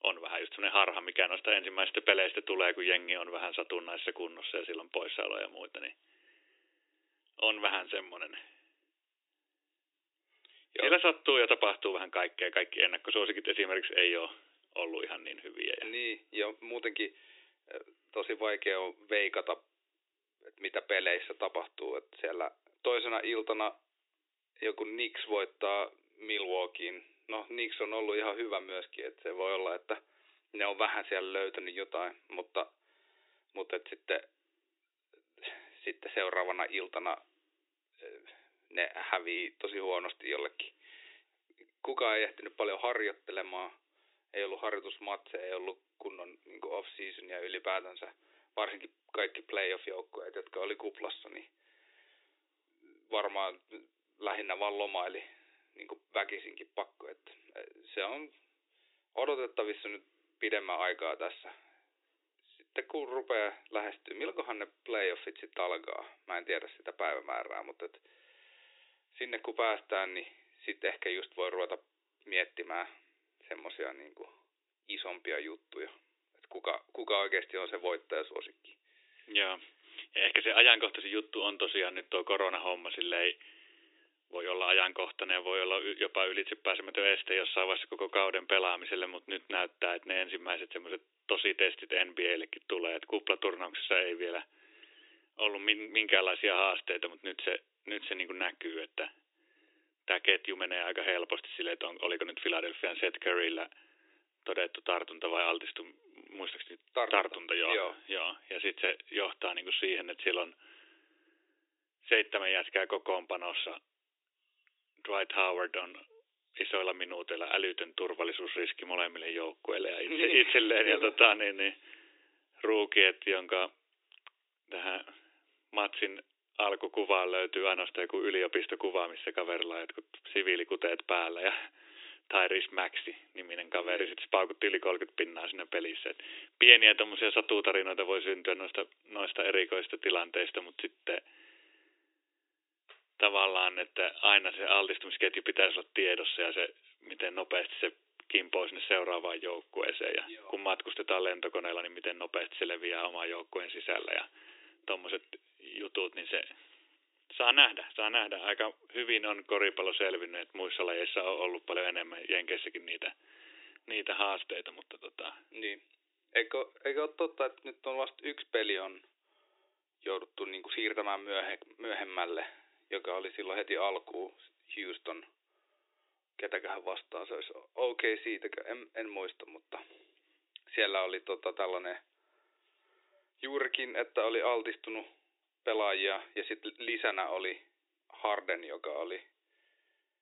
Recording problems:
thin; very; fading below 300 Hz
high frequencies cut off; severe; nothing above 4 kHz

